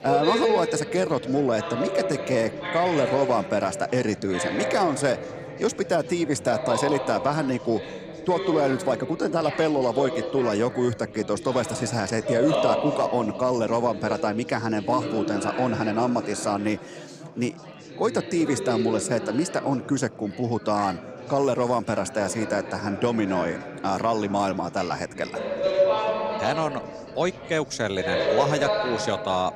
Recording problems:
chatter from many people; loud; throughout; 5 dB below the speech

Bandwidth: 15.5 kHz